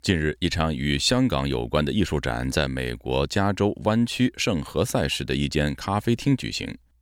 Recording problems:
none

